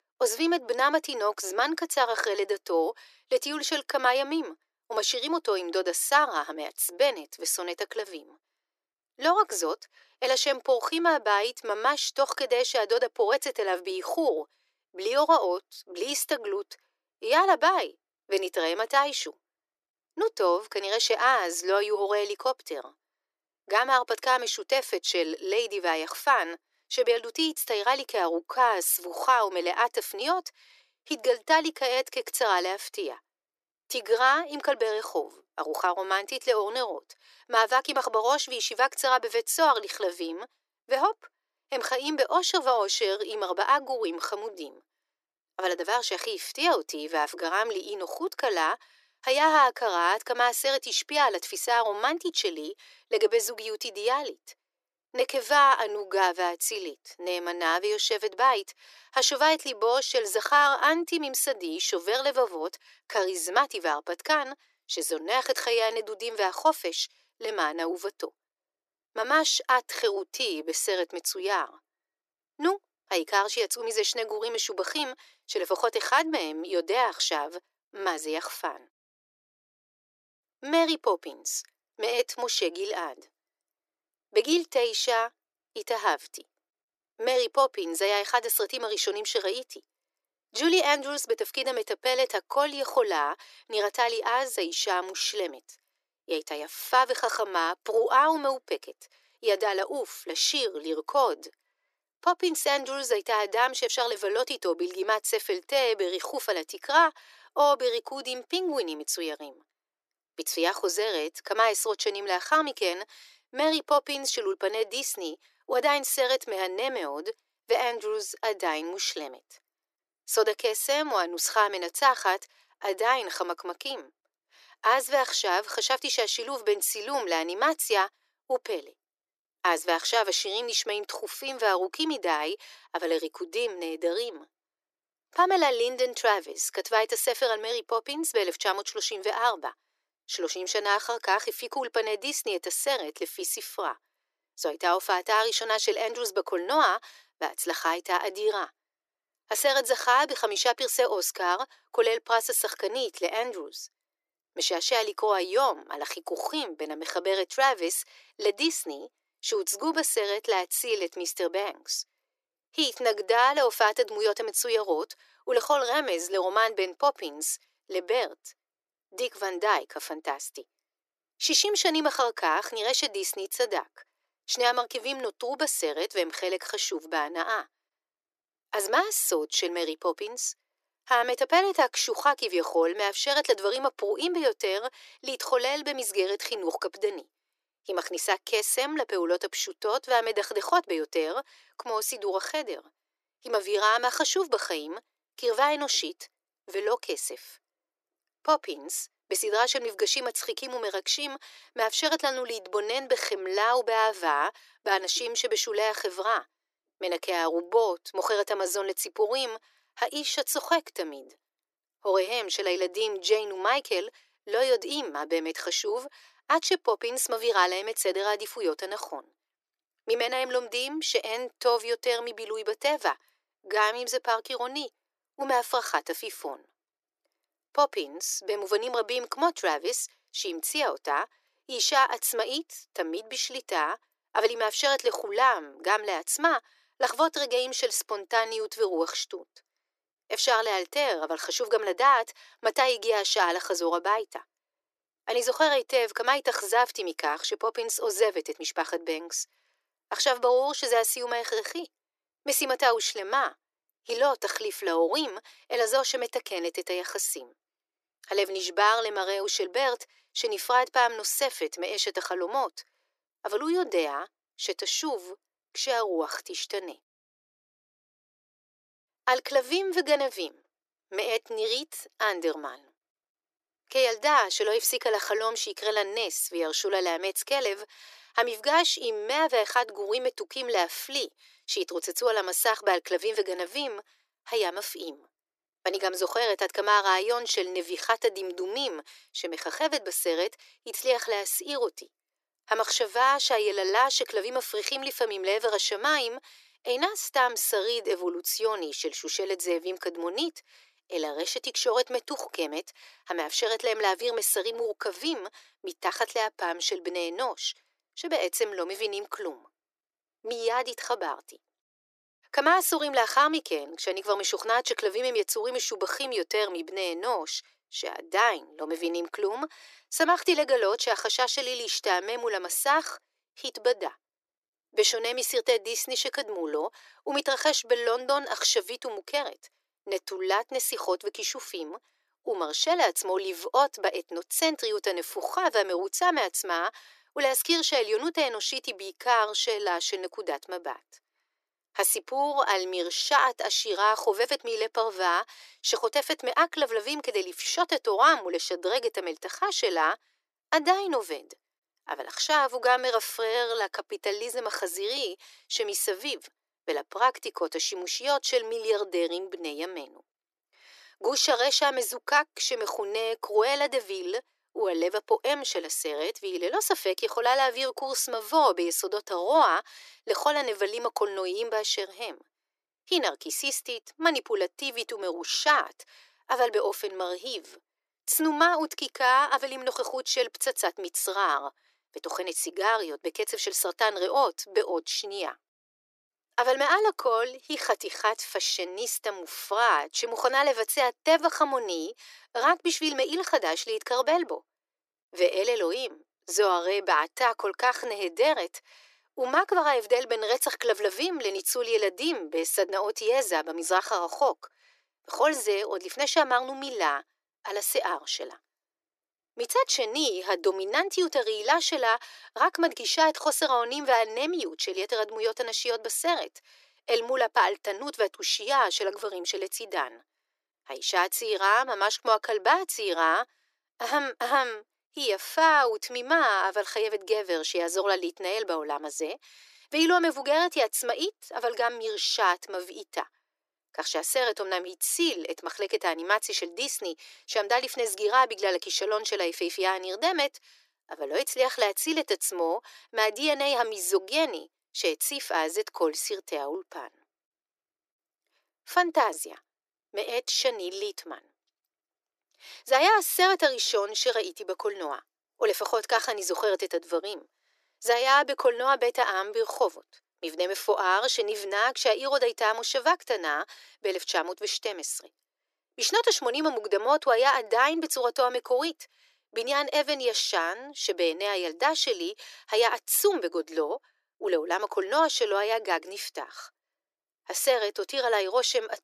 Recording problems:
thin; very; fading below 300 Hz

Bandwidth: 14 kHz